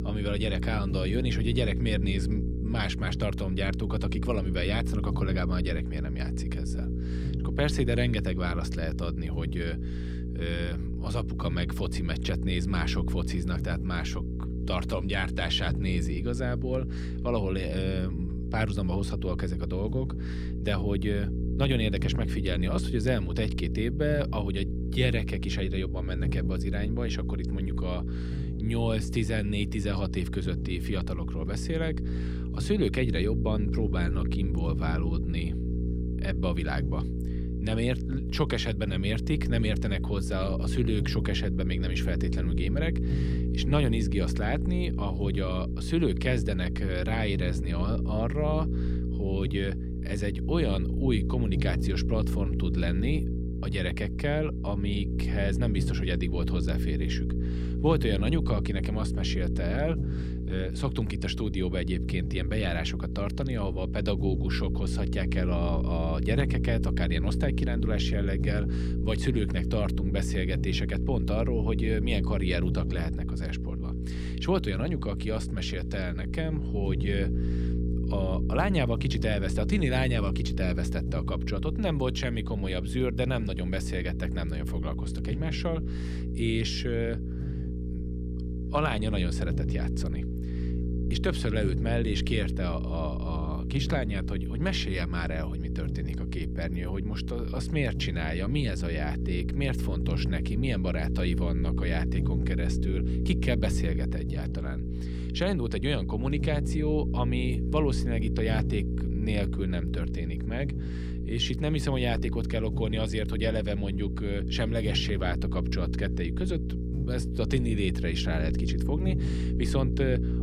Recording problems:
electrical hum; loud; throughout; 60 Hz, 7 dB below the speech

